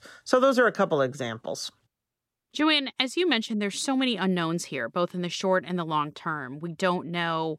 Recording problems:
none

